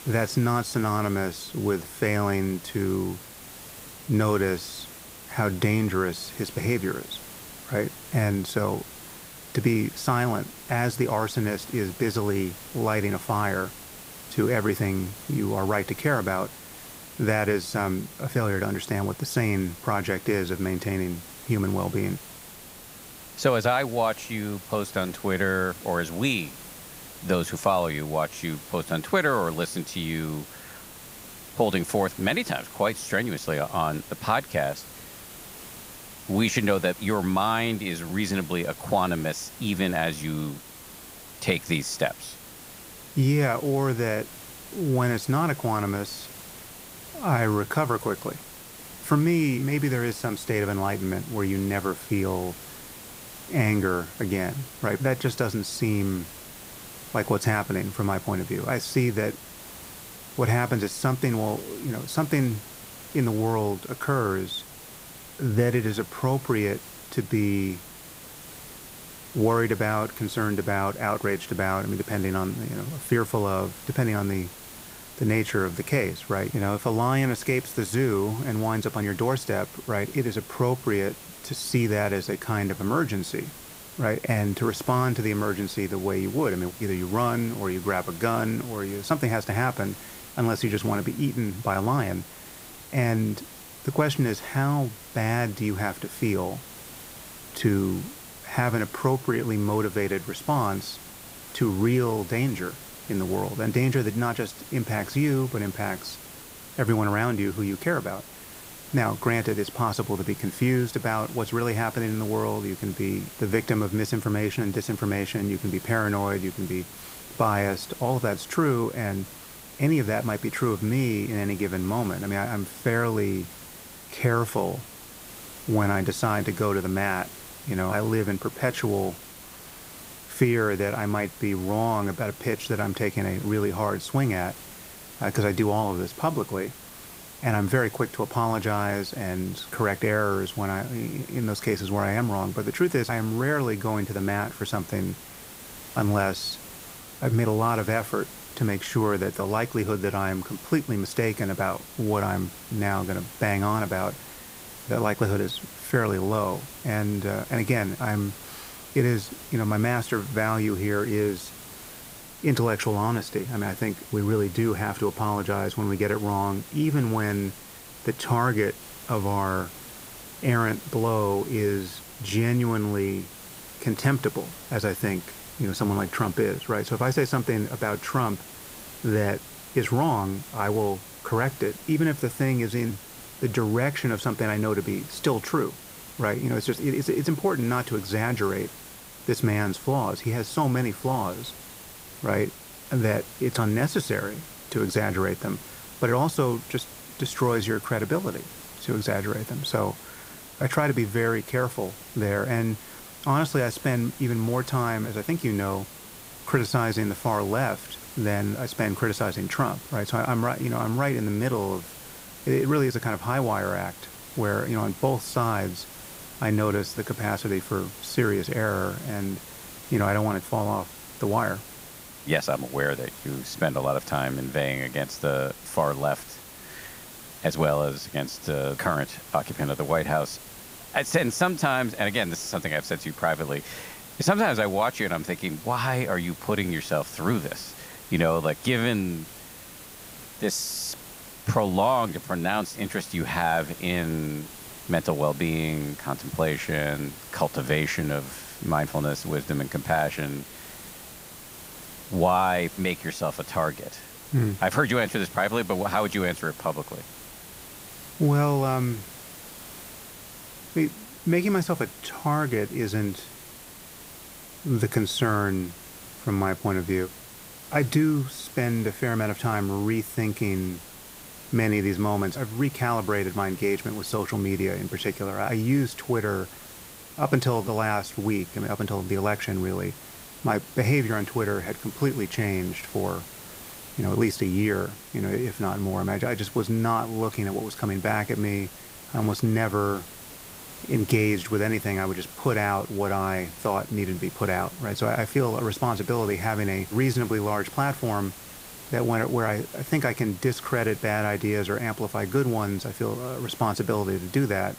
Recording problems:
hiss; noticeable; throughout; 15 dB below the speech

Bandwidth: 15.5 kHz